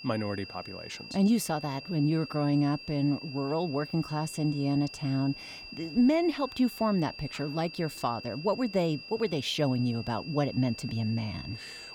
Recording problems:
high-pitched whine; noticeable; throughout; 5 kHz, 15 dB below the speech
murmuring crowd; faint; throughout; 30 dB below the speech

